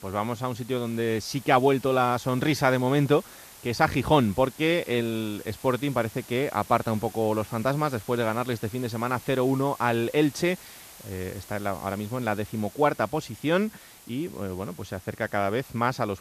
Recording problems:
hiss; noticeable; throughout; 20 dB below the speech

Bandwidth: 14.5 kHz